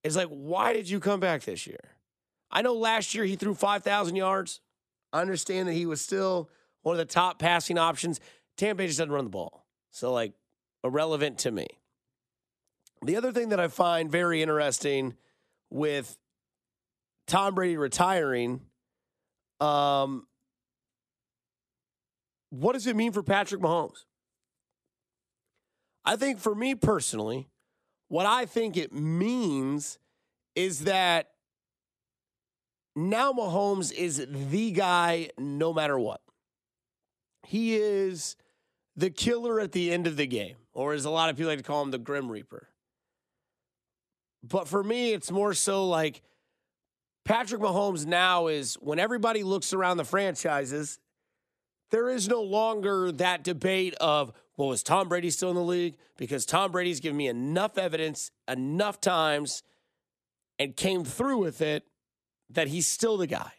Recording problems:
none

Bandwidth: 14.5 kHz